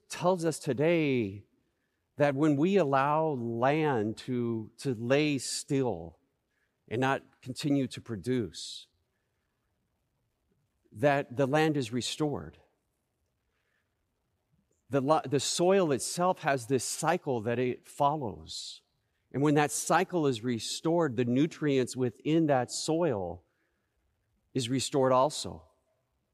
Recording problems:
none

